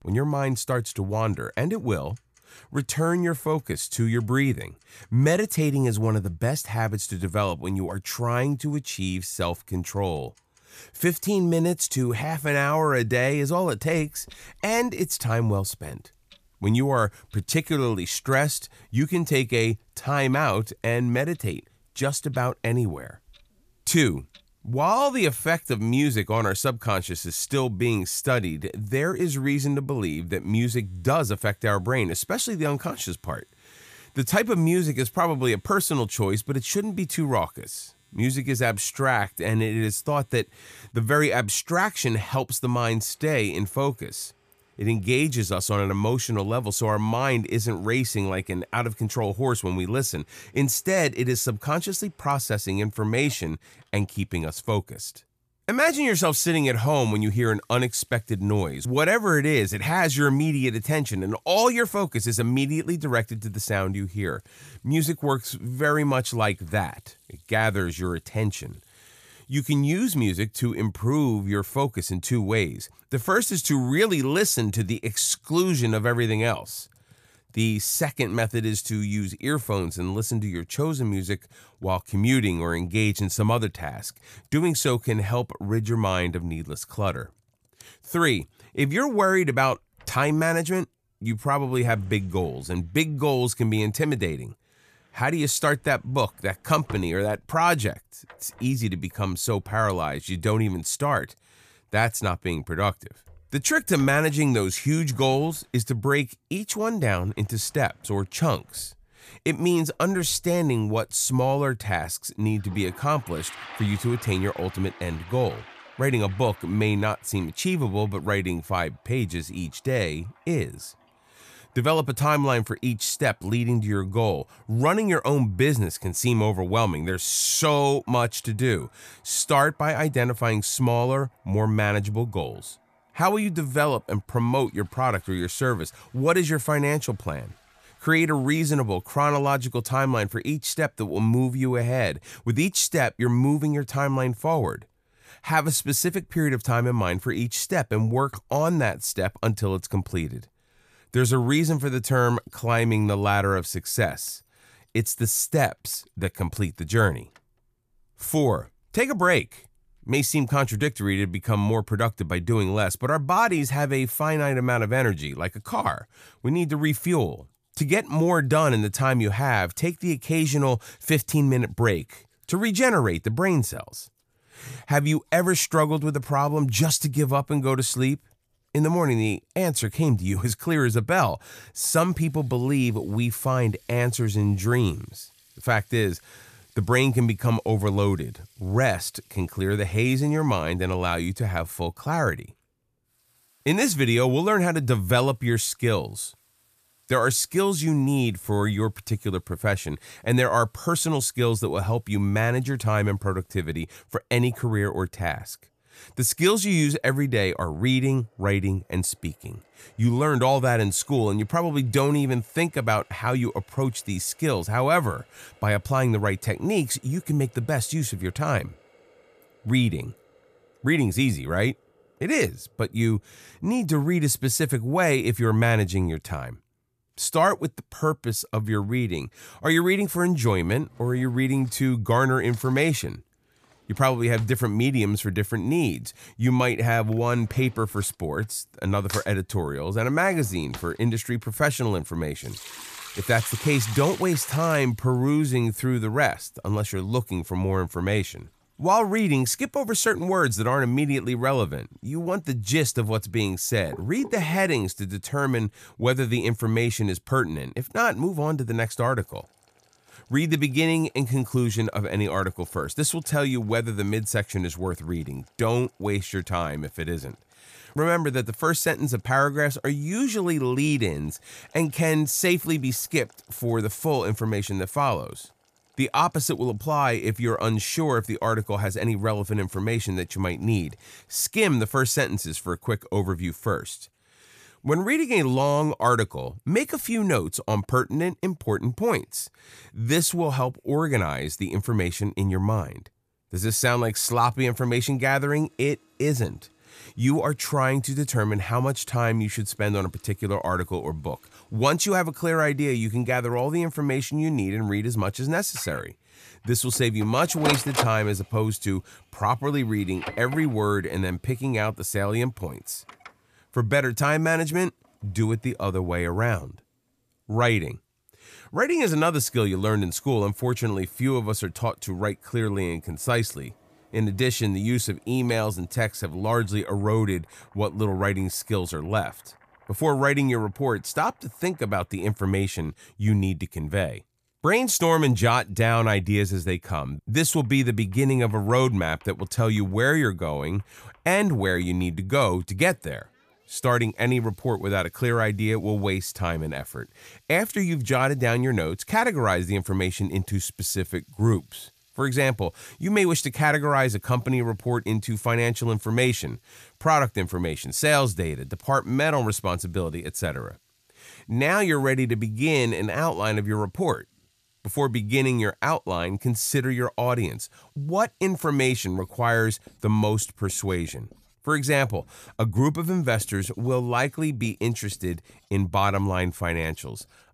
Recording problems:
household noises; faint; throughout; 20 dB below the speech

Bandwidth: 14.5 kHz